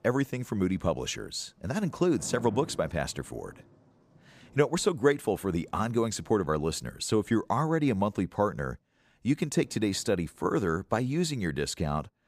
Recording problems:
rain or running water; faint; throughout; 20 dB below the speech

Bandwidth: 15 kHz